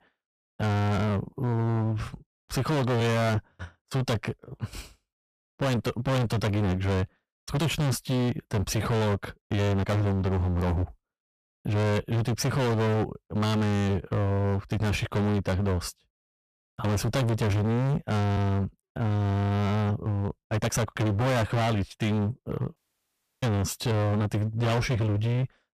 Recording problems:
distortion; heavy; 30% of the sound clipped
uneven, jittery; strongly; from 1.5 to 24 s
audio cutting out; at 23 s for 0.5 s

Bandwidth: 15 kHz